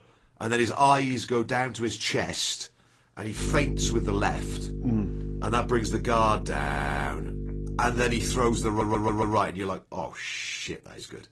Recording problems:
garbled, watery; slightly; nothing above 10 kHz
electrical hum; noticeable; from 3.5 to 9.5 s; 50 Hz, 15 dB below the speech
audio stuttering; at 6.5 s and at 8.5 s

